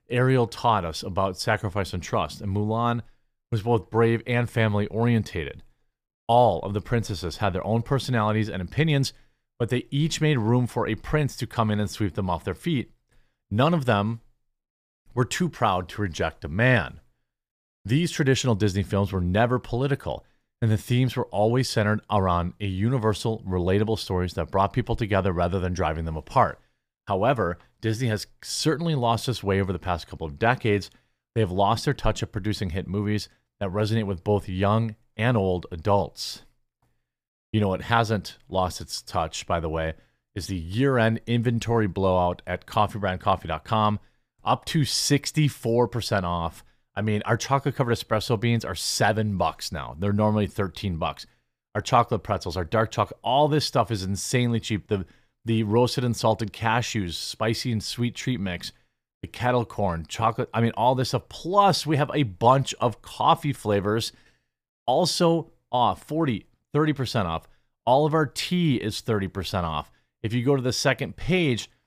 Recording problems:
none

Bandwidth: 15 kHz